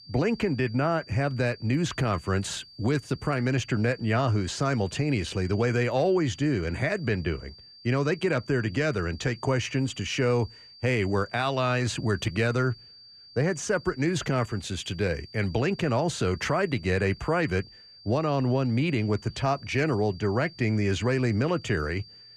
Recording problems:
high-pitched whine; faint; throughout; 4.5 kHz, 20 dB below the speech

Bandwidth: 14.5 kHz